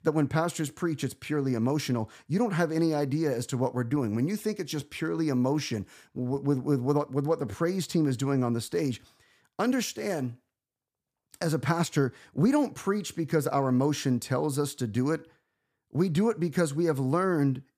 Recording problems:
none

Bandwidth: 15 kHz